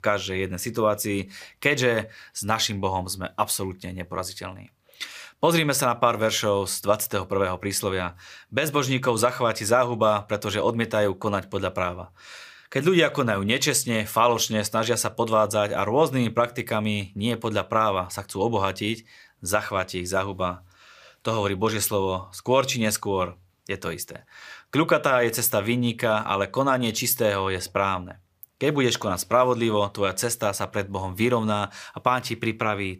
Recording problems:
none

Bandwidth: 15 kHz